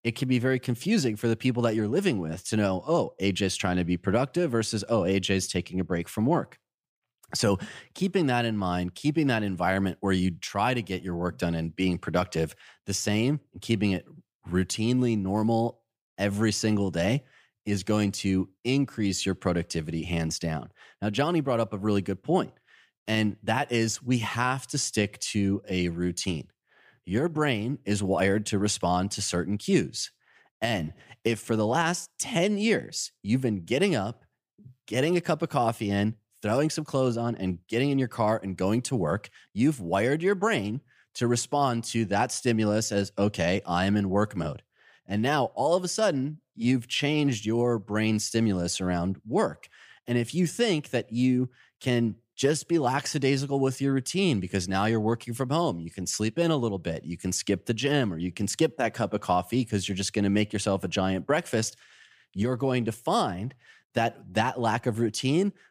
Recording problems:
none

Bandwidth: 15 kHz